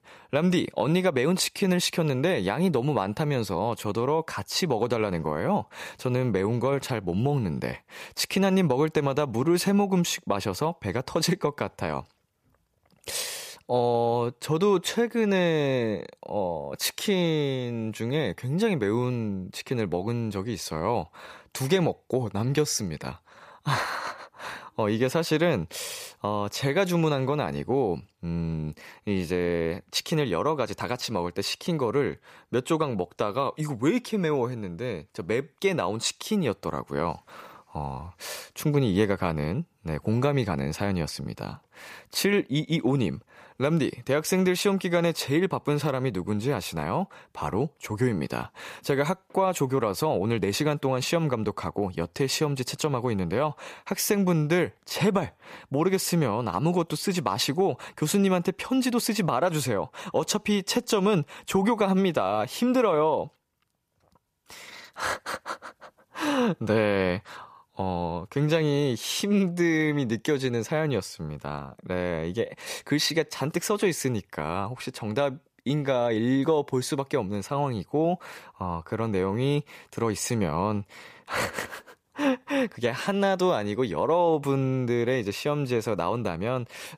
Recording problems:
none

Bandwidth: 14.5 kHz